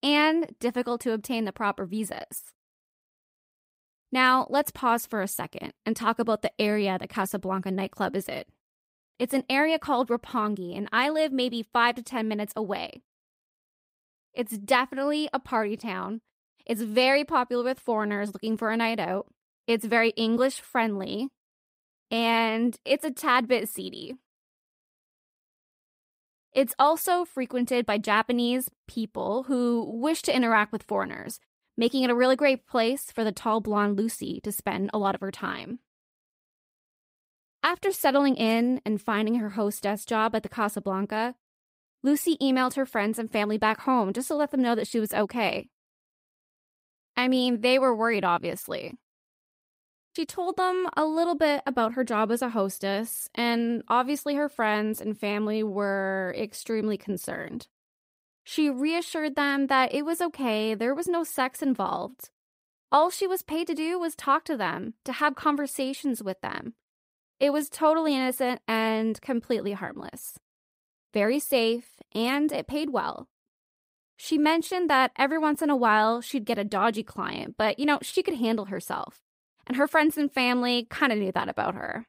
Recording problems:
none

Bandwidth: 15.5 kHz